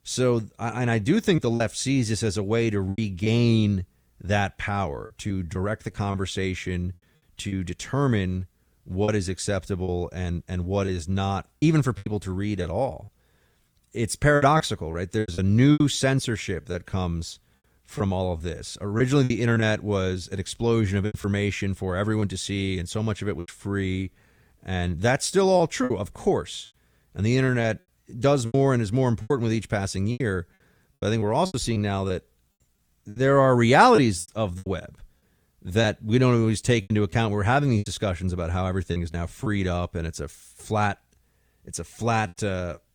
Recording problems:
choppy; very; 7% of the speech affected

